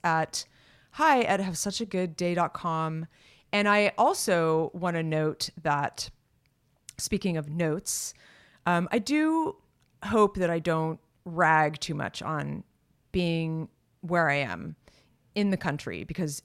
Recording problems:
none

